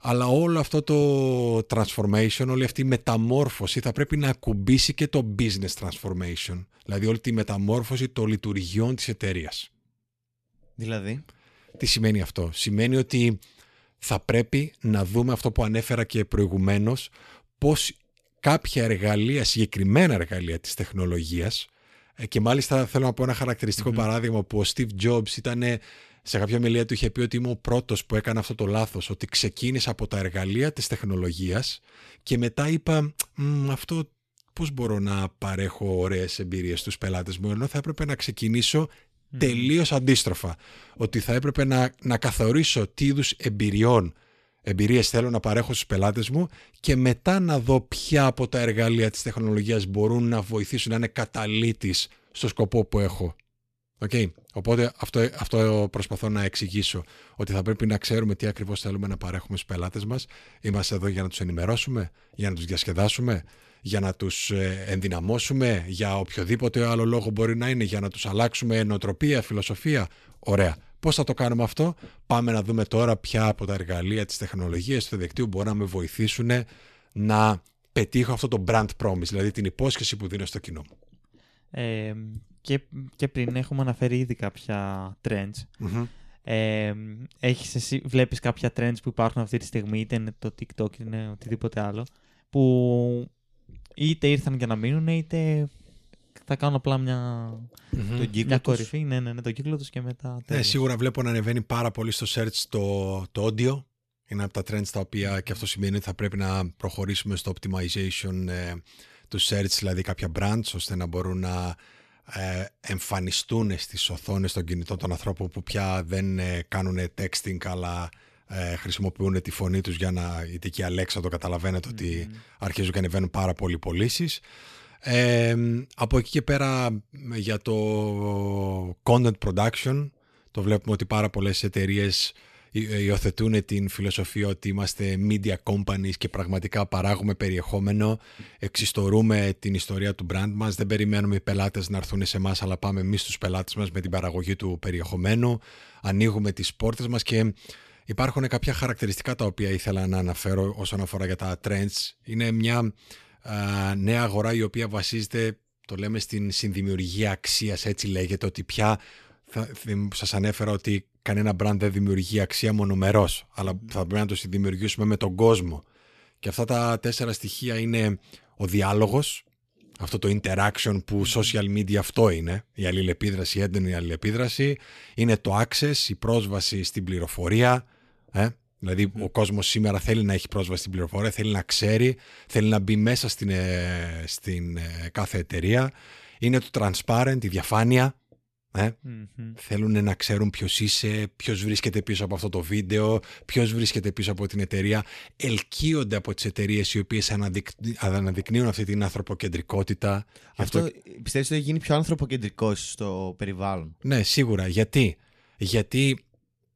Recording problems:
none

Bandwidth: 14 kHz